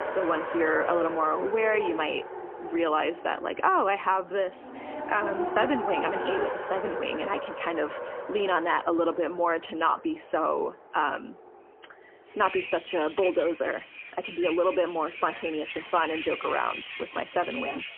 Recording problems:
phone-call audio; poor line; nothing above 3 kHz
traffic noise; loud; throughout; 7 dB below the speech

